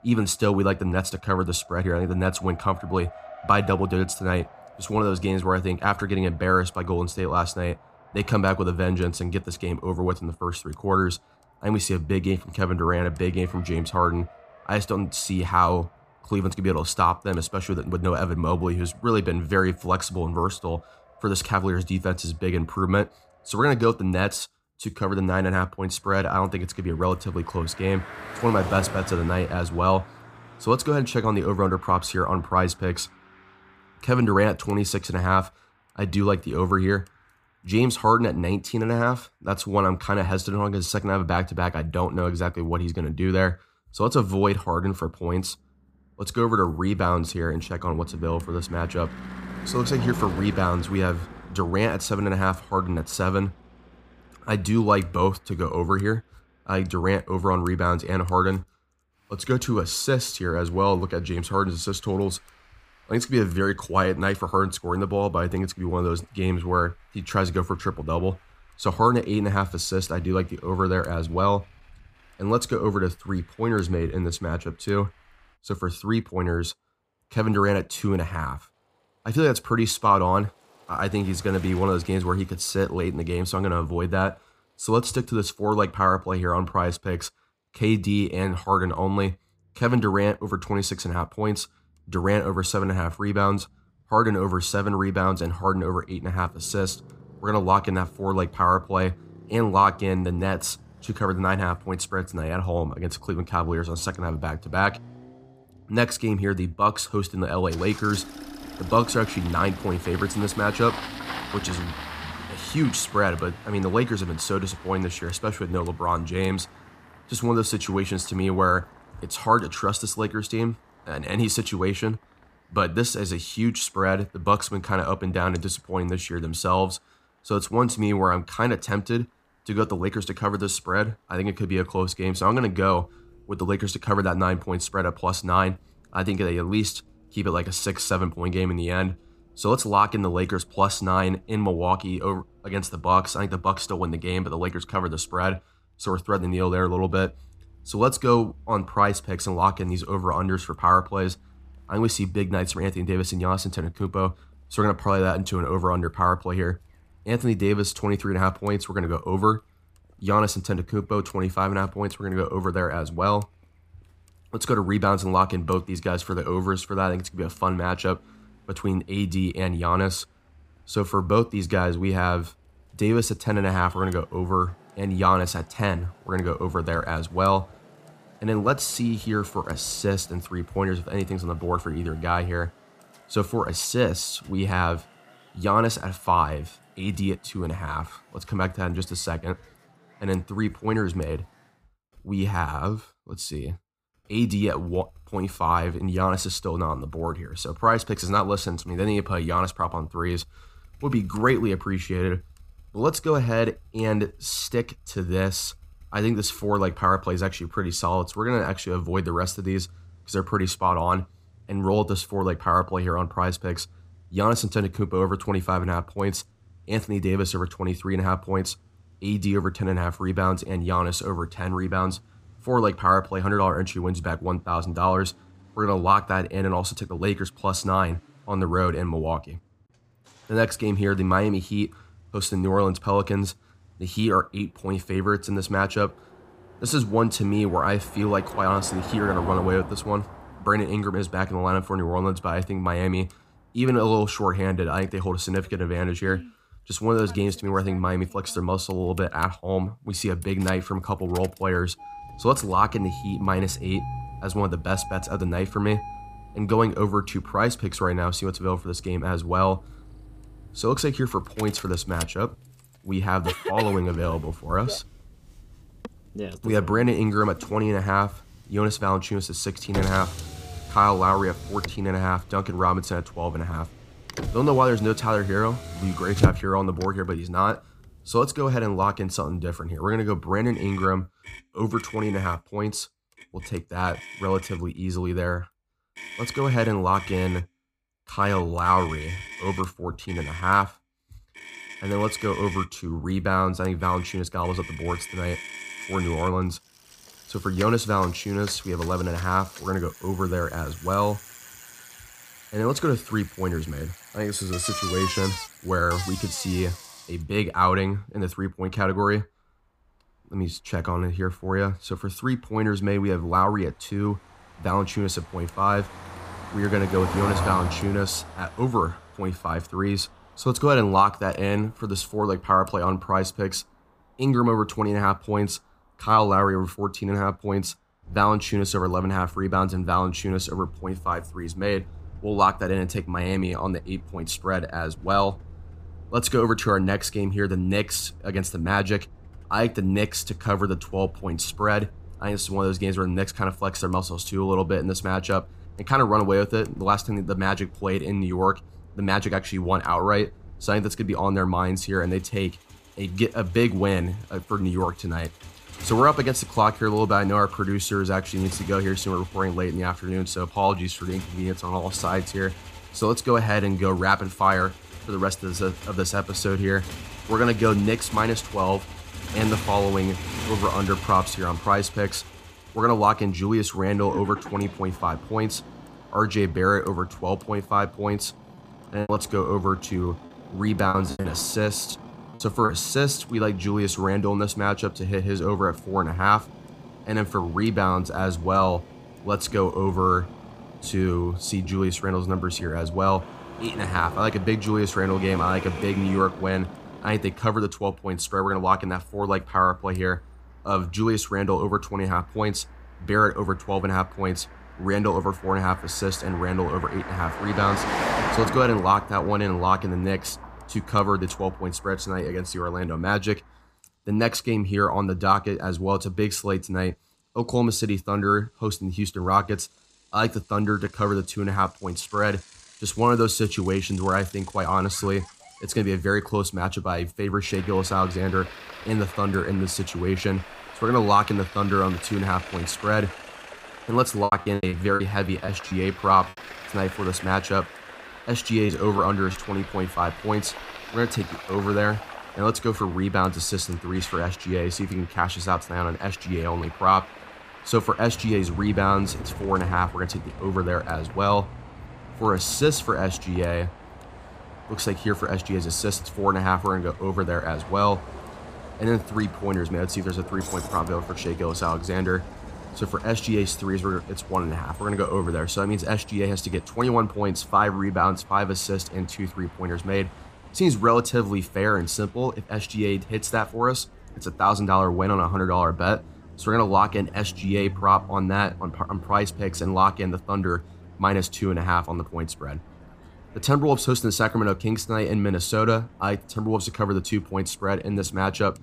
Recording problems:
traffic noise; noticeable; throughout; 15 dB below the speech
choppy; very; from 6:19 to 6:23 and from 7:14 to 7:16; 11% of the speech affected

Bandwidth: 15 kHz